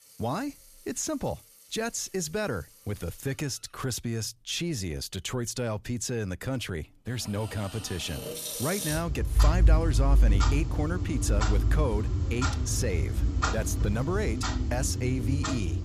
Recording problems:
household noises; very loud; throughout; 4 dB above the speech

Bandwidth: 14.5 kHz